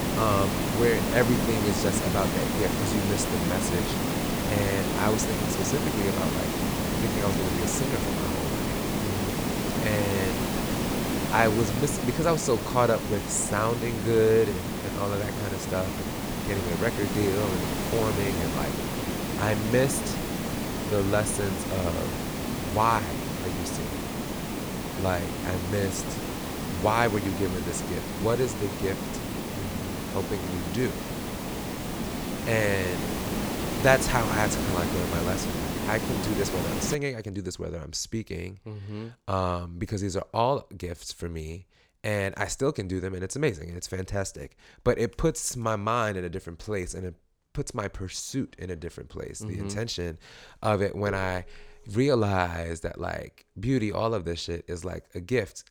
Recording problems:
hiss; loud; until 37 s; 1 dB below the speech

